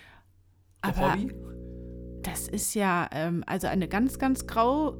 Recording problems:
electrical hum; faint; from 1 to 2.5 s and from 3.5 s on; 60 Hz, 20 dB below the speech

